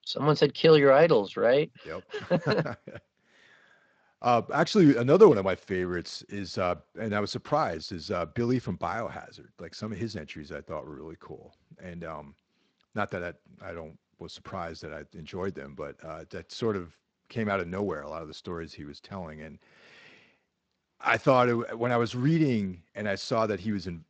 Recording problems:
garbled, watery; slightly; nothing above 7.5 kHz

